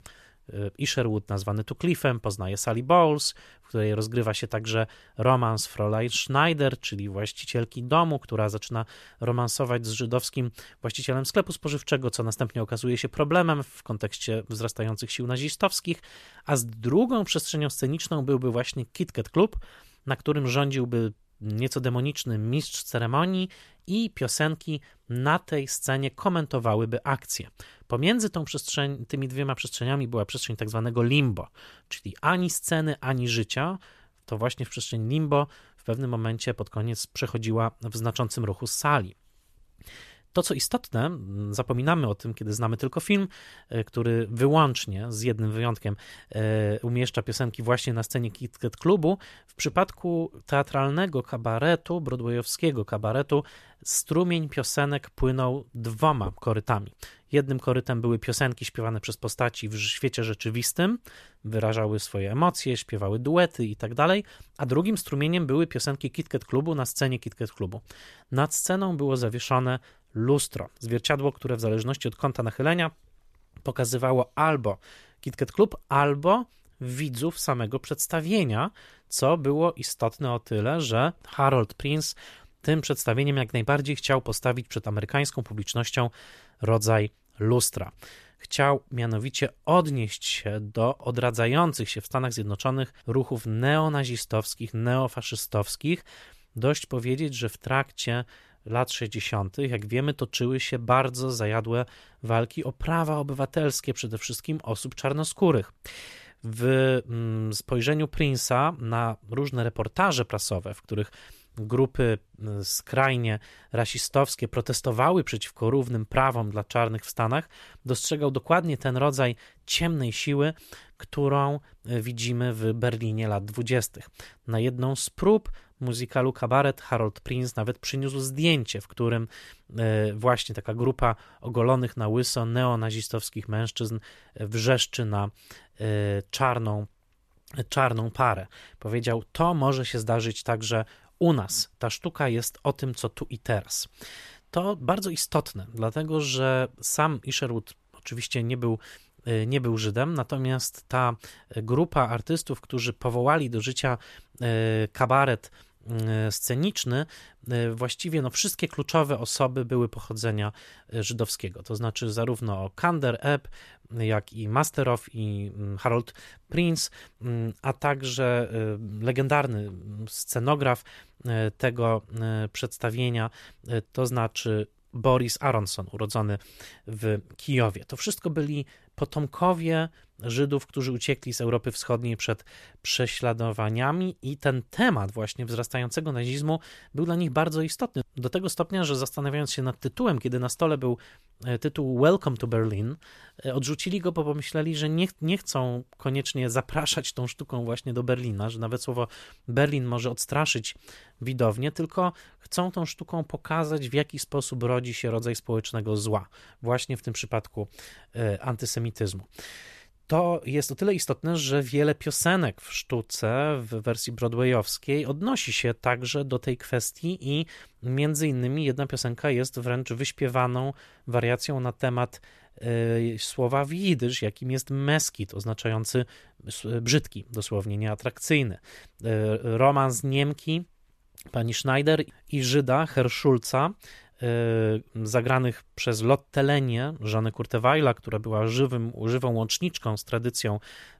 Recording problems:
none

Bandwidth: 14 kHz